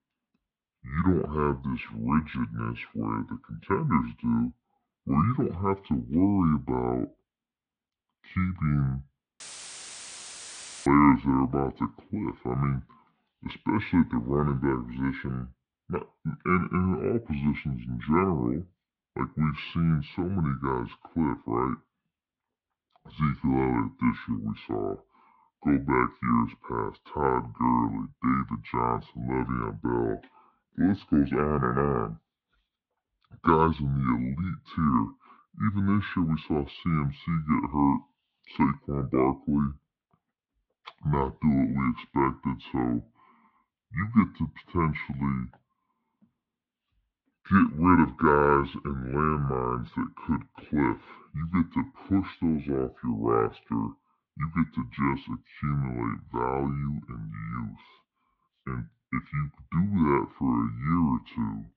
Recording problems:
wrong speed and pitch; too slow and too low; 0.7 times normal speed
muffled; slightly; fading above 3.5 kHz
audio cutting out; filled with static; at 9.5 s for 1.5 s

